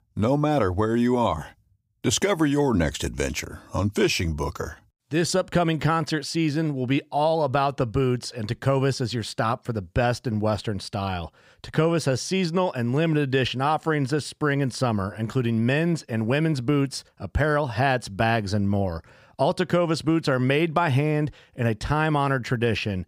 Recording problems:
none

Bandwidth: 15.5 kHz